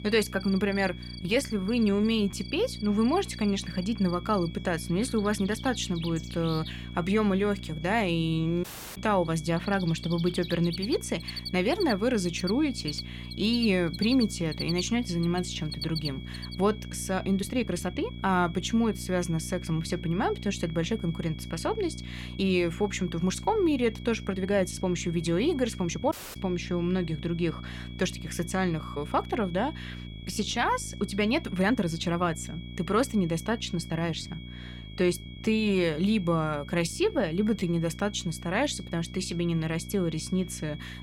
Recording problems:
high-pitched whine; noticeable; throughout; 3.5 kHz, 20 dB below the speech
animal sounds; noticeable; until 16 s; 10 dB below the speech
electrical hum; faint; throughout; 60 Hz, 20 dB below the speech
uneven, jittery; strongly; from 1 to 38 s
audio cutting out; at 8.5 s and at 26 s

